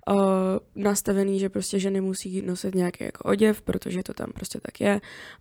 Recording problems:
none

